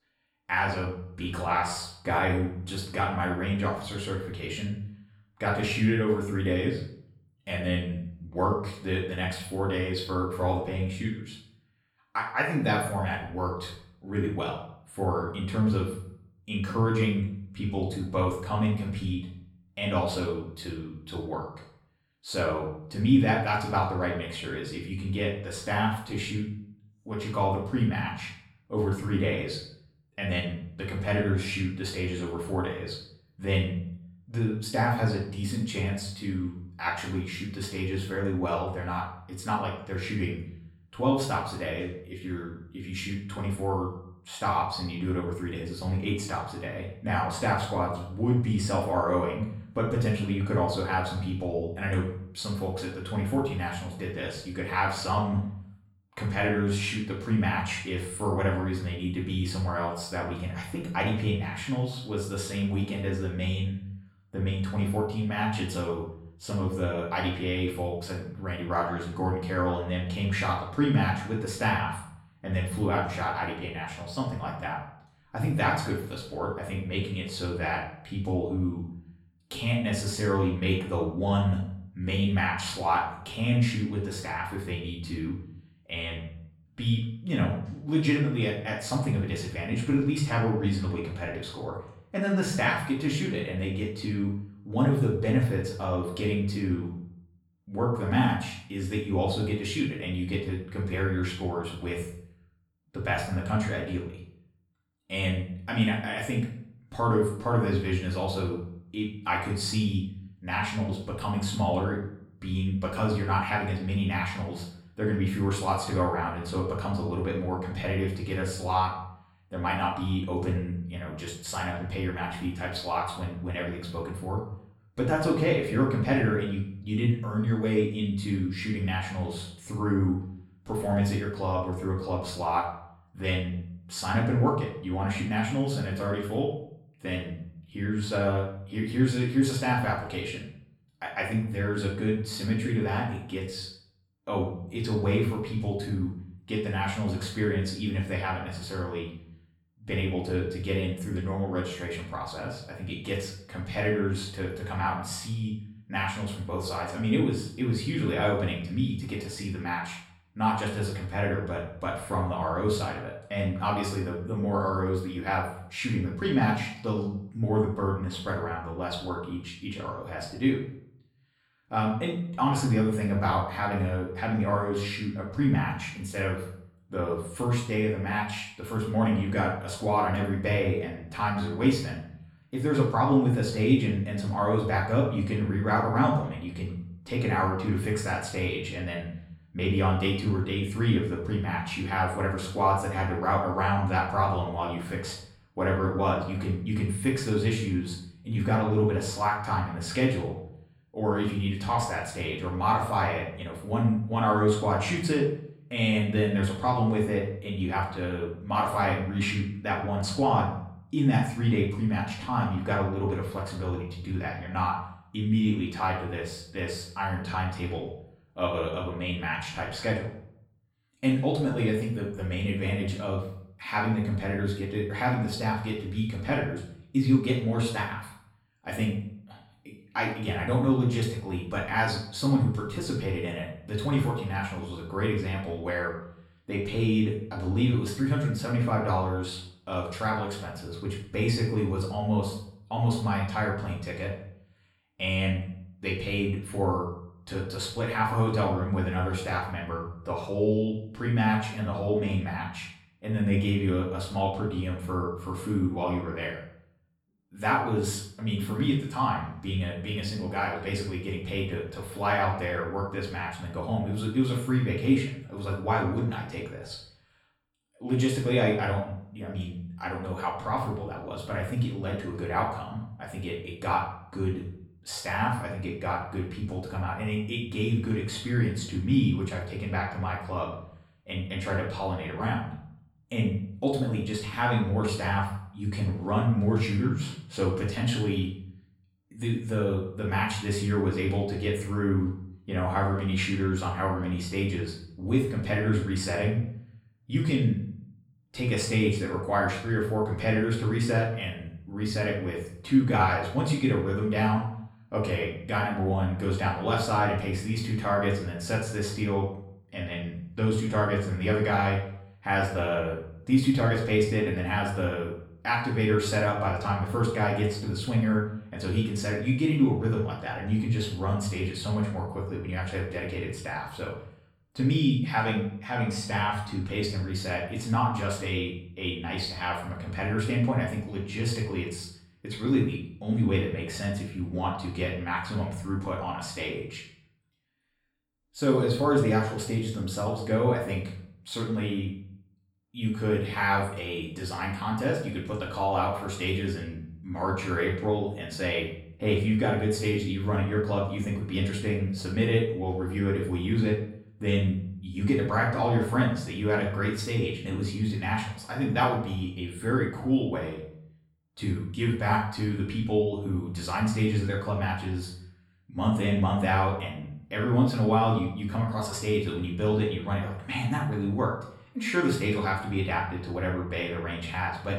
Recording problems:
off-mic speech; far
room echo; noticeable; dies away in 0.5 s

